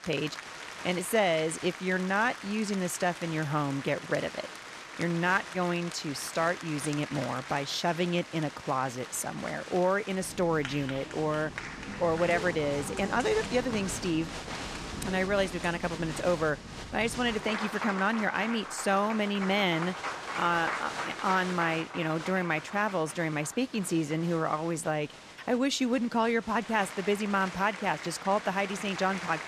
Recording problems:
crowd noise; loud; throughout; 9 dB below the speech

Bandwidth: 14 kHz